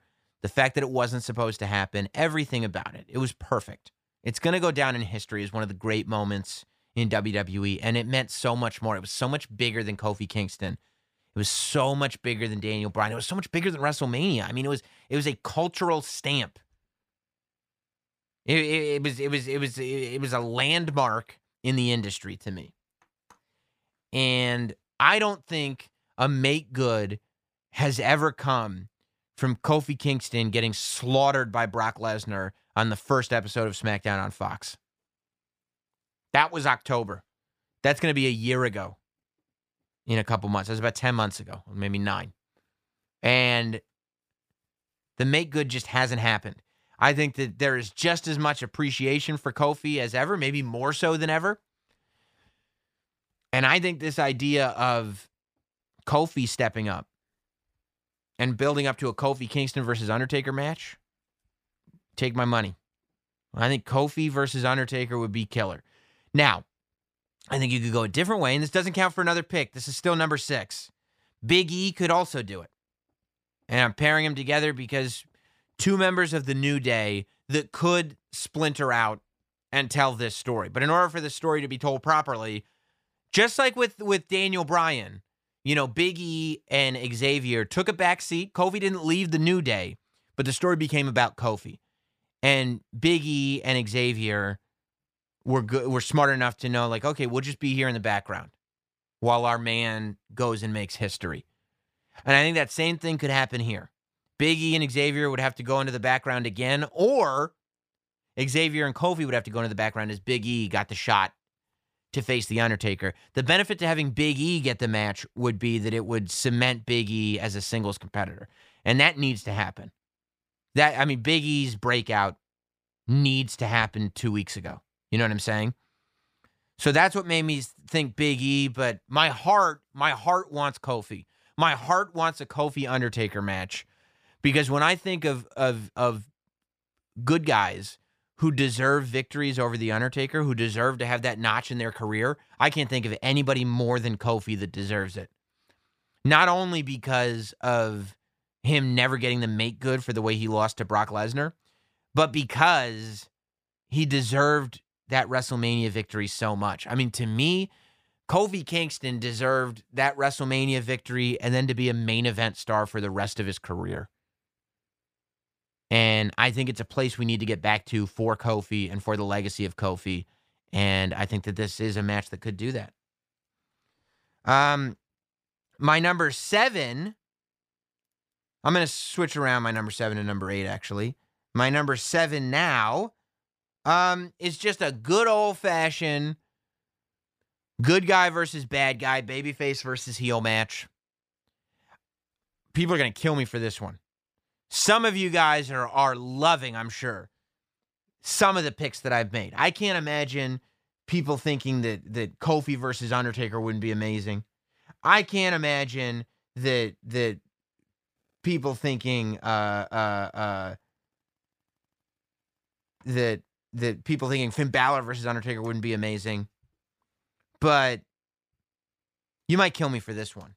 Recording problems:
none

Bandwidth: 15 kHz